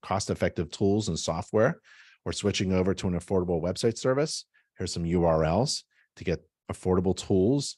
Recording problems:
none

